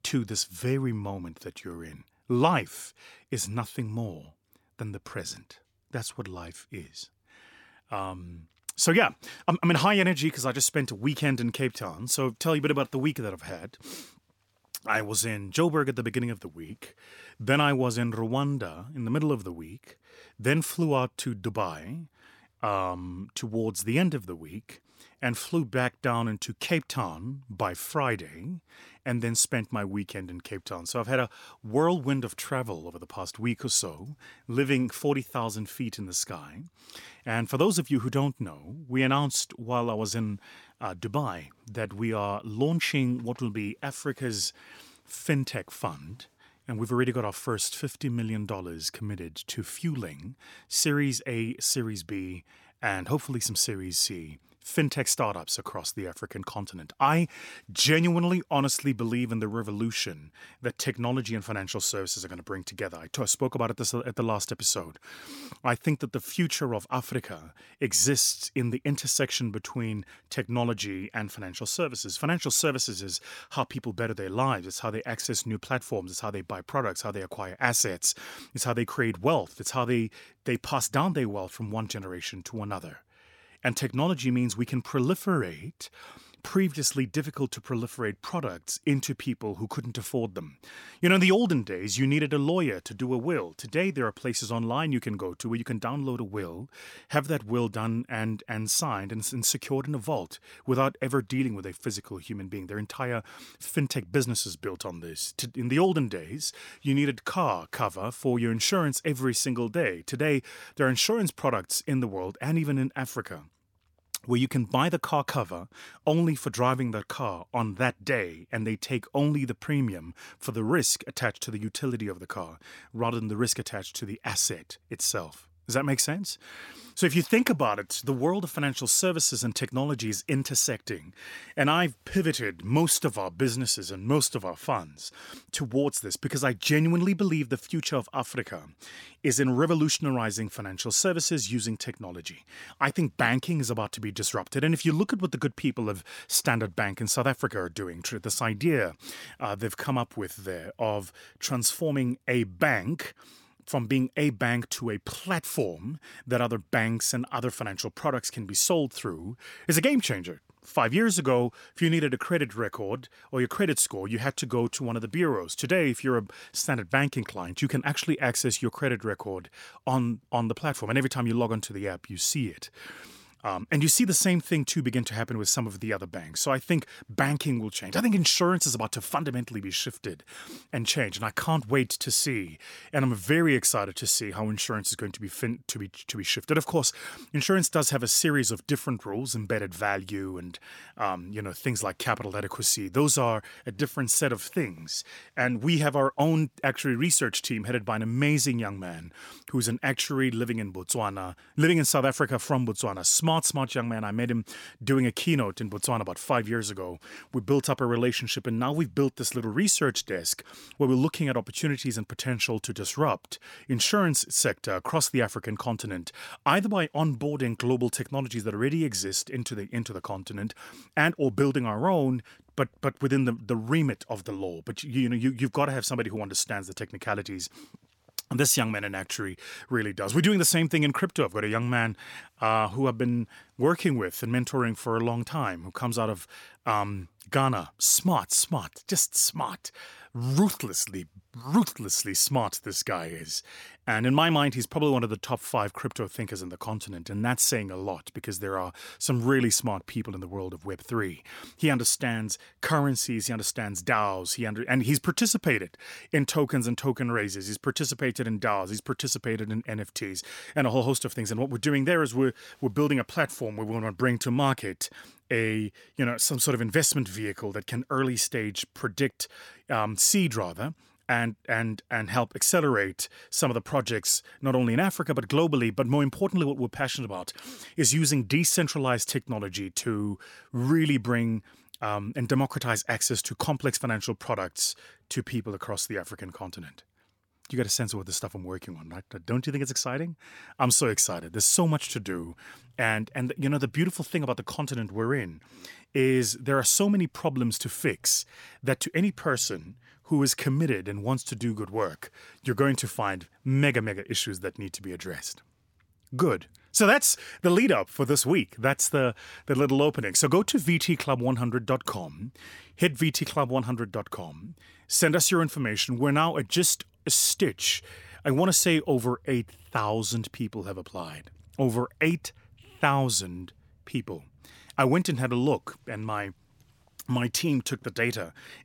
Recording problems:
none

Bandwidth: 17 kHz